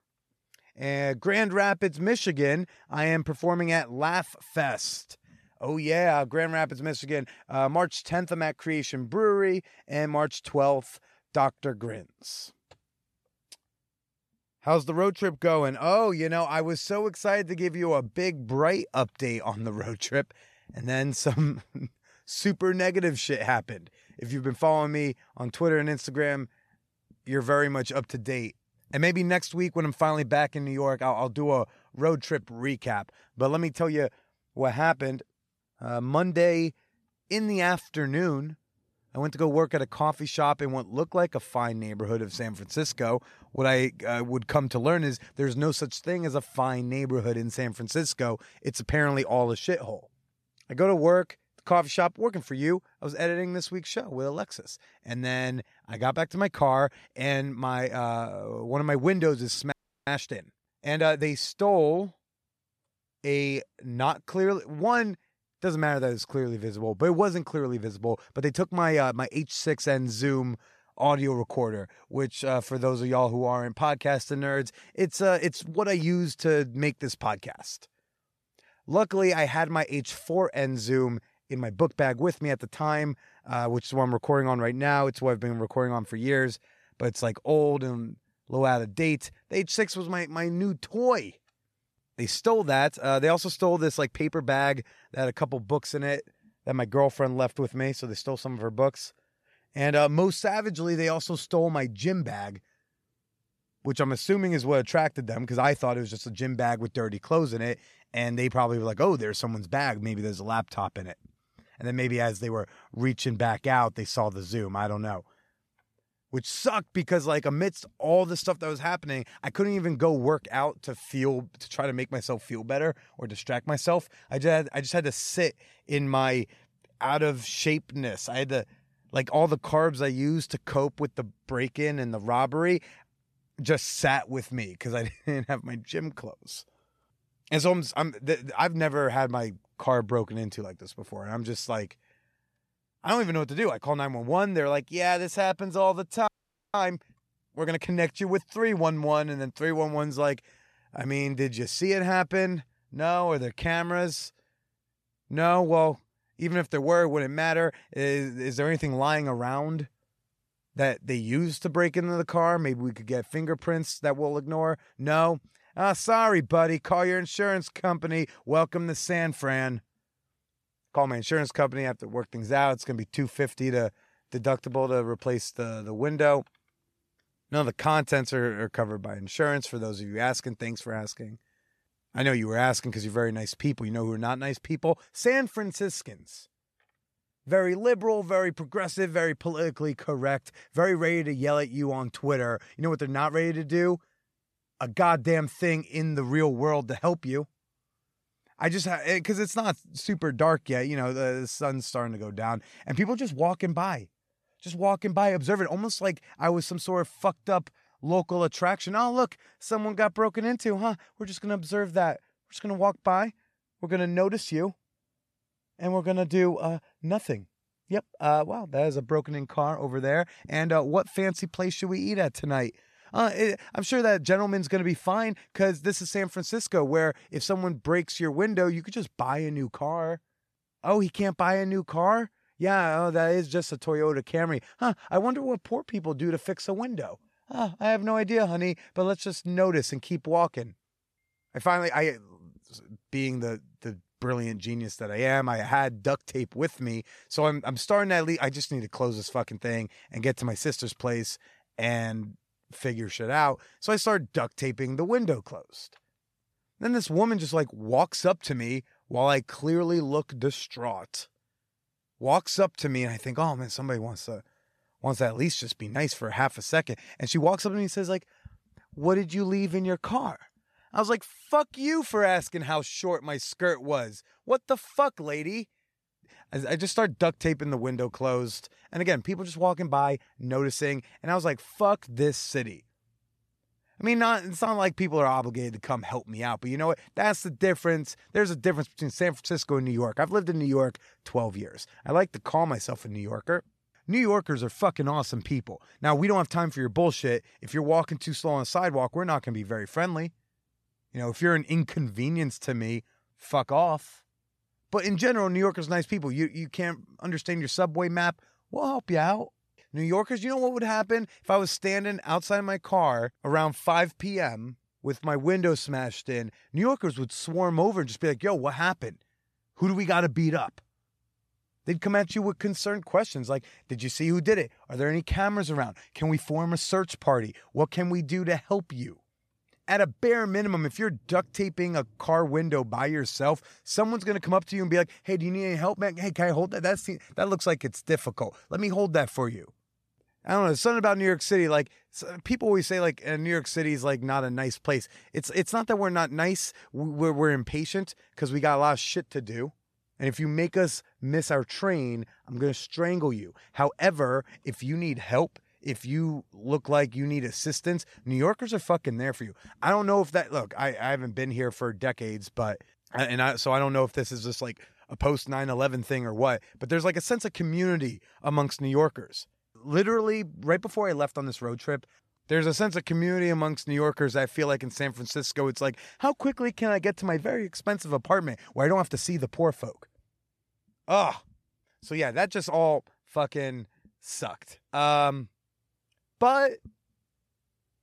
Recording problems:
audio freezing; at 1:00 and at 2:26

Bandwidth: 13.5 kHz